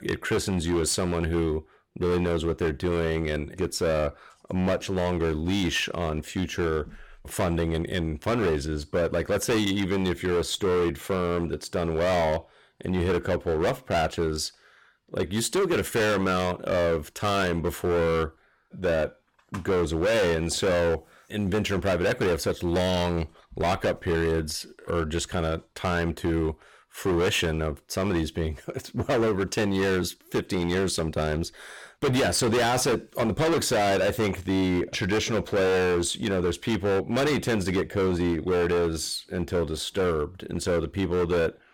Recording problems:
distortion; heavy; 18% of the sound clipped

